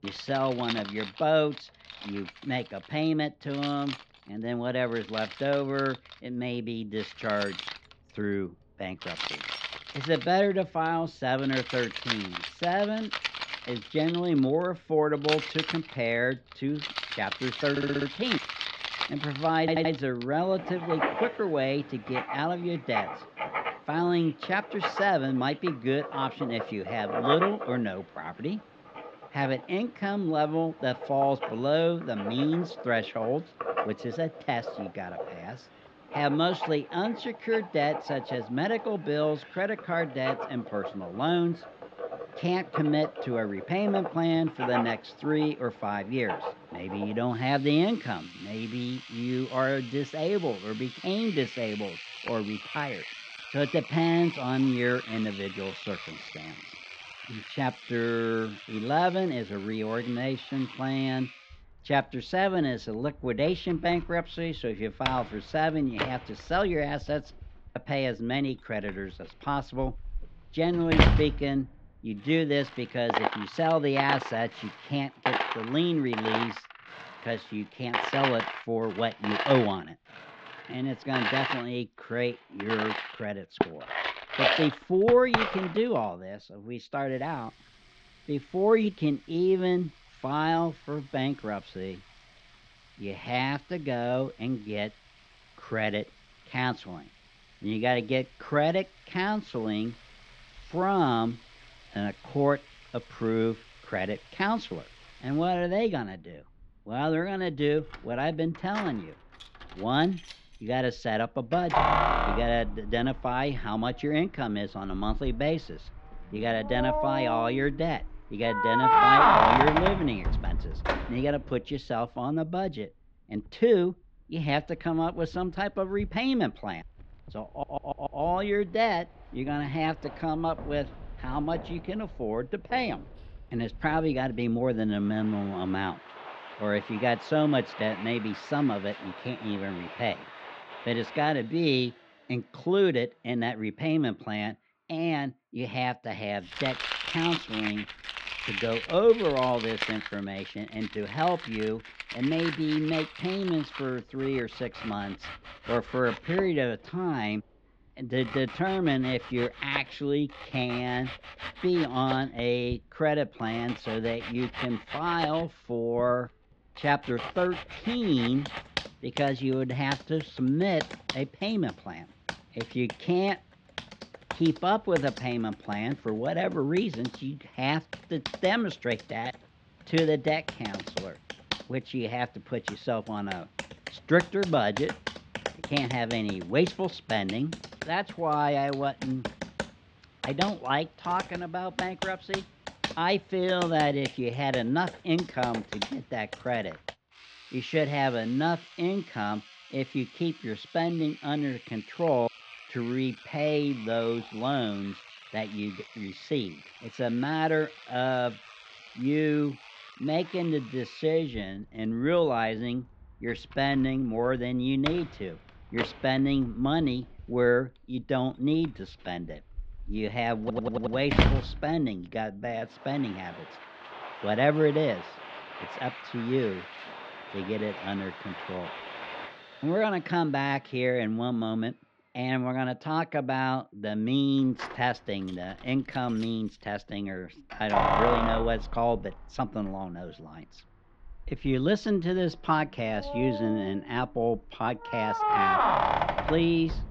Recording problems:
muffled; slightly; fading above 3.5 kHz
household noises; loud; throughout; 4 dB below the speech
audio stuttering; 4 times, first at 18 s

